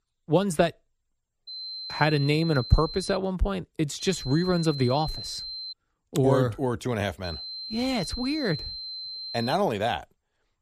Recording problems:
high-pitched whine; loud; from 1.5 to 3 s, from 4 to 5.5 s and from 7 to 9.5 s; 4 kHz, 9 dB below the speech

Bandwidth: 14.5 kHz